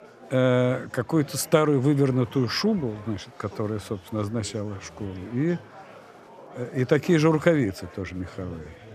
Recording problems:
murmuring crowd; faint; throughout; 20 dB below the speech

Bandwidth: 14 kHz